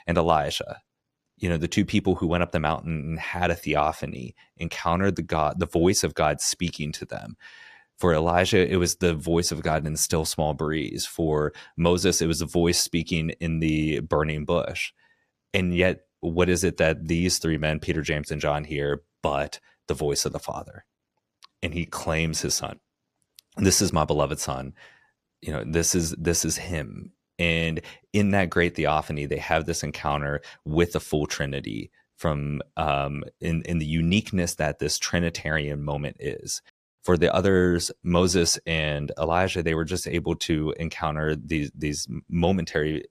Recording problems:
none

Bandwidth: 14.5 kHz